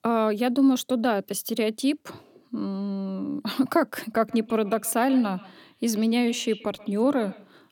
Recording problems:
echo of what is said; faint; from 4 s on; 130 ms later, 20 dB below the speech

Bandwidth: 17 kHz